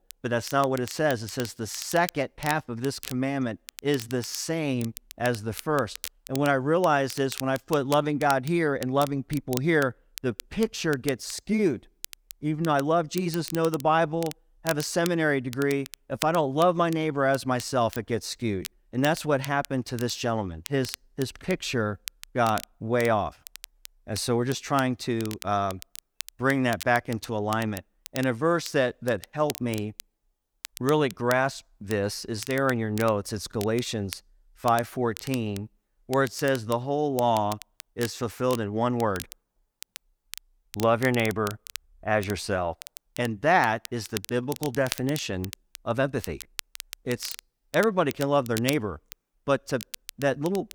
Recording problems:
crackle, like an old record; noticeable; 15 dB below the speech

